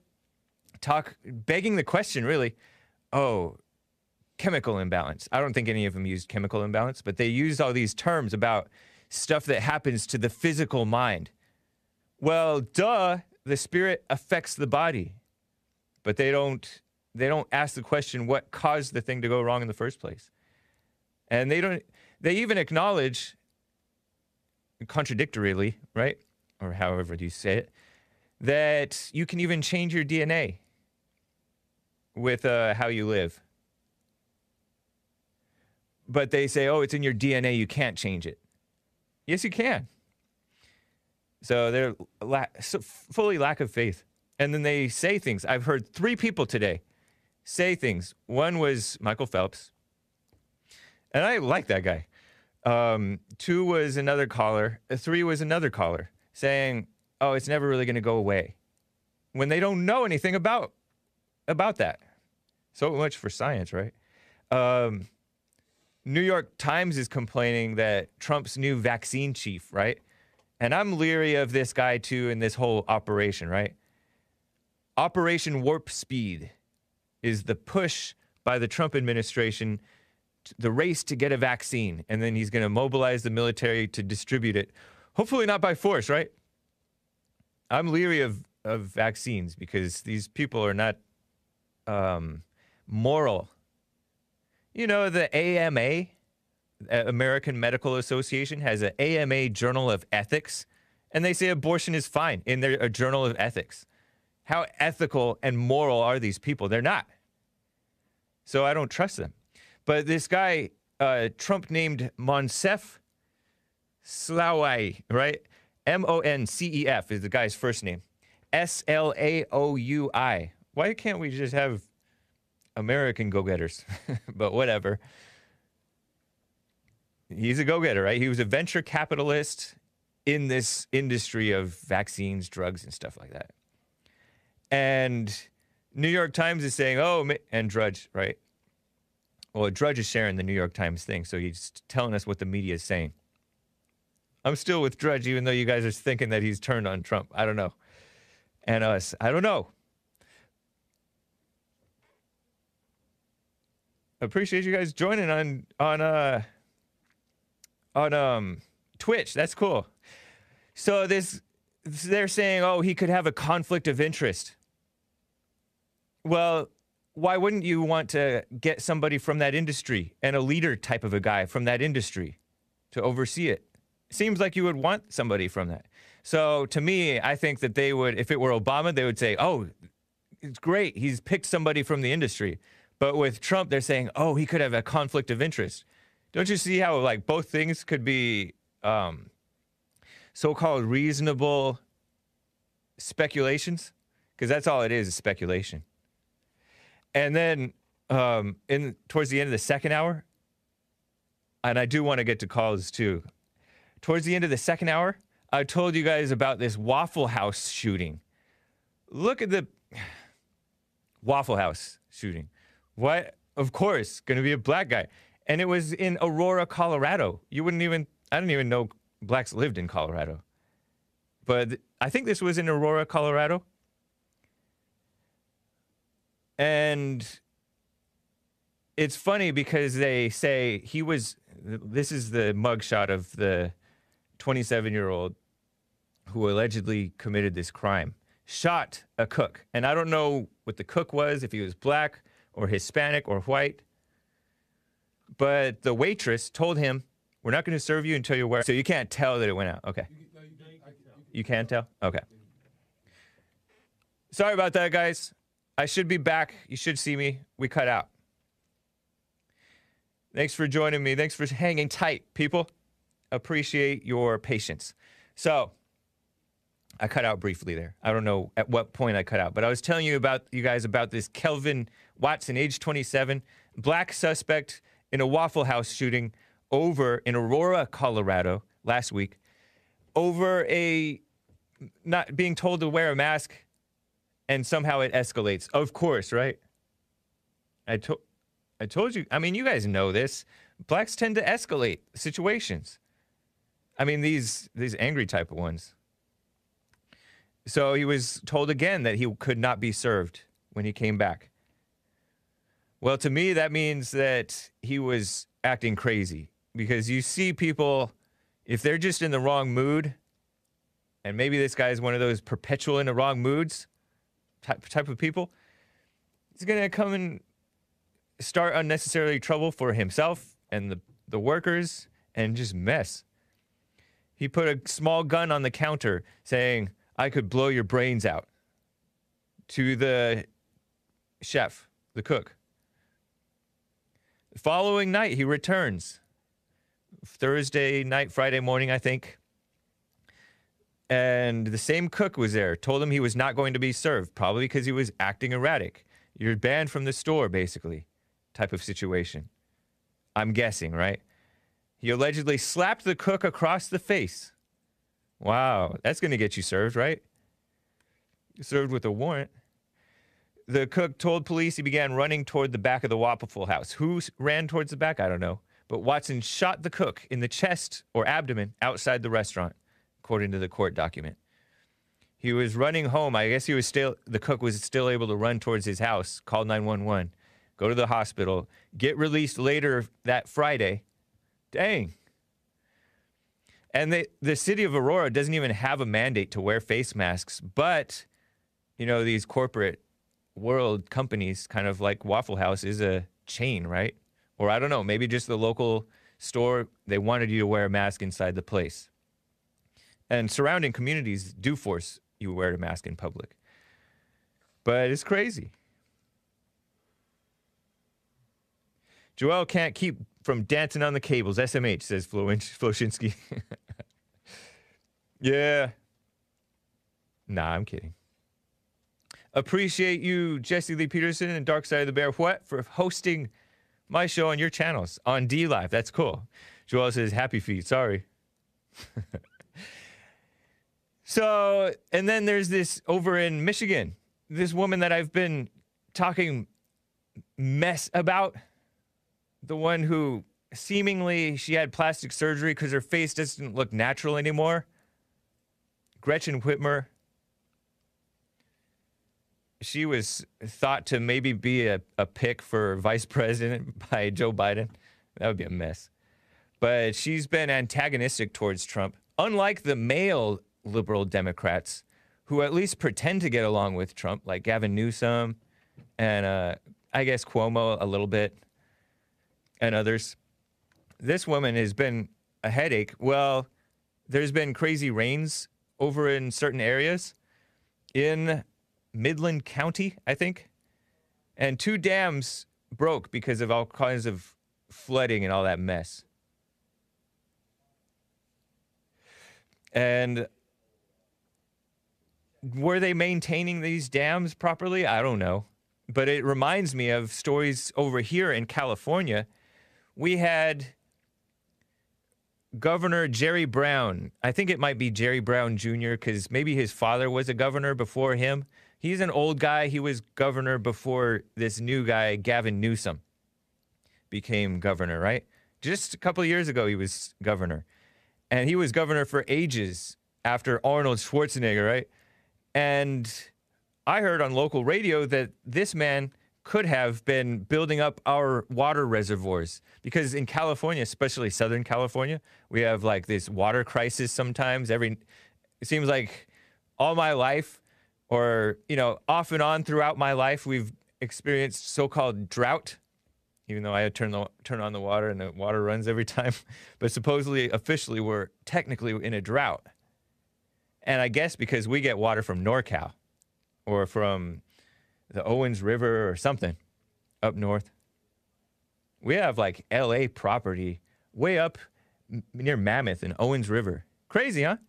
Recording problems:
none

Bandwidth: 14.5 kHz